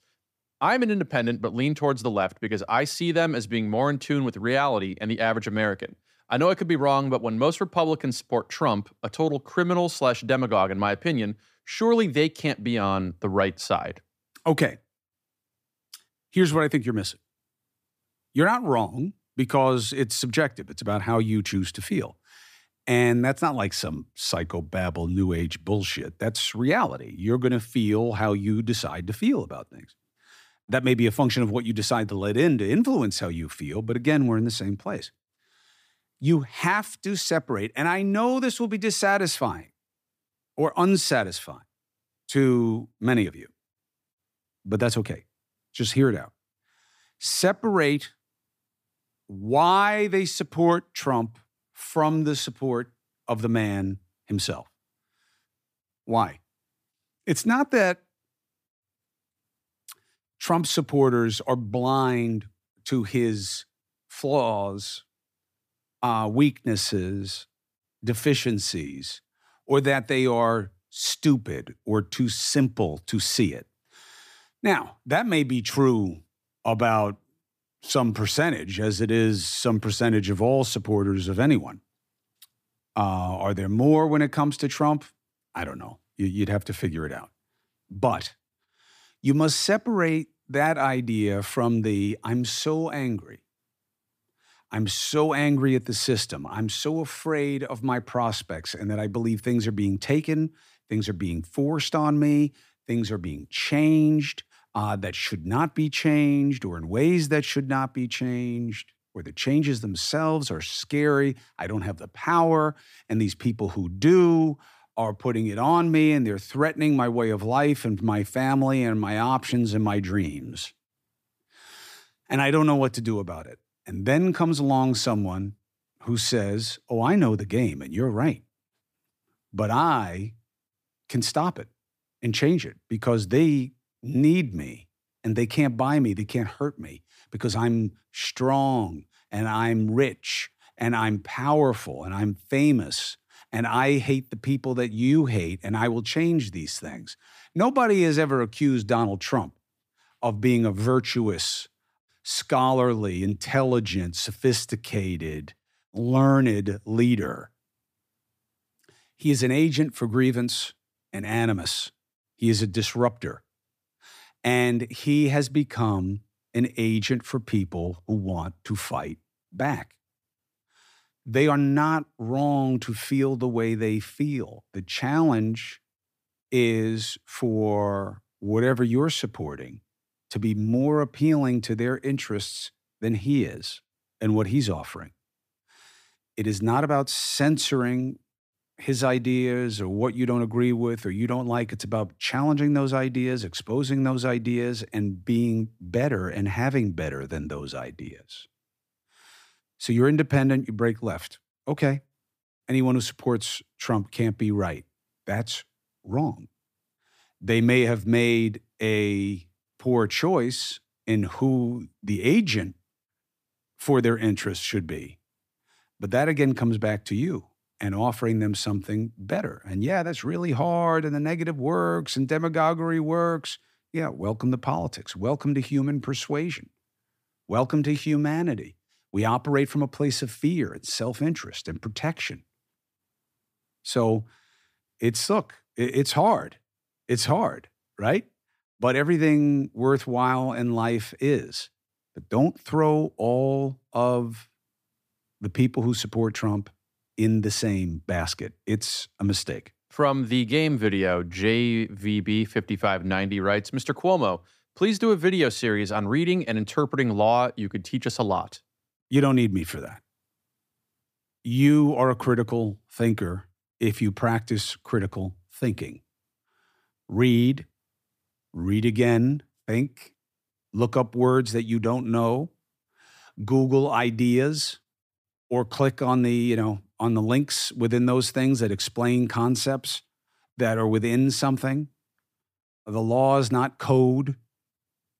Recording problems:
none

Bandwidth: 15 kHz